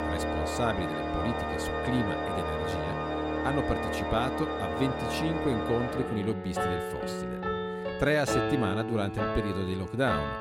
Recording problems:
background music; very loud; throughout; as loud as the speech

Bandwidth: 16 kHz